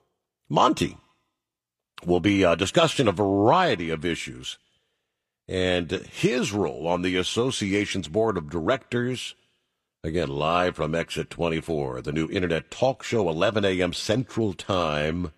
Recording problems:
none

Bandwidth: 15 kHz